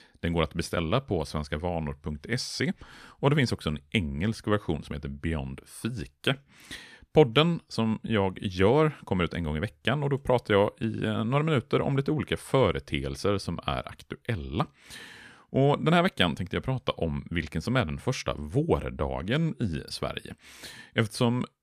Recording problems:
none

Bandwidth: 14.5 kHz